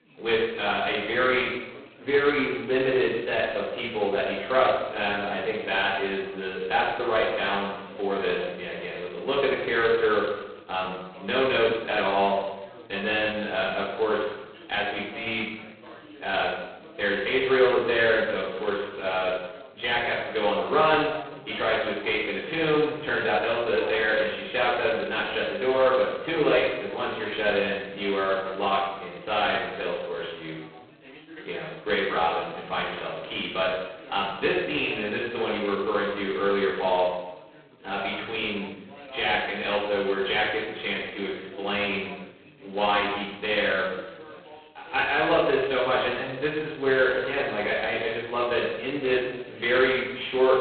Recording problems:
phone-call audio; poor line; nothing above 4 kHz
off-mic speech; far
room echo; noticeable; dies away in 0.8 s
background chatter; faint; throughout; 4 voices, 20 dB below the speech

